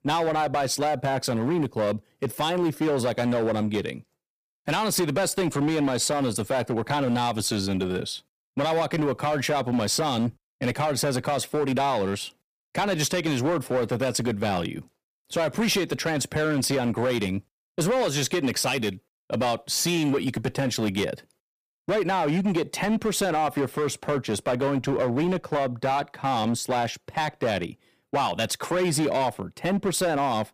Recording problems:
distortion; slight; 13% of the sound clipped

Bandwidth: 15 kHz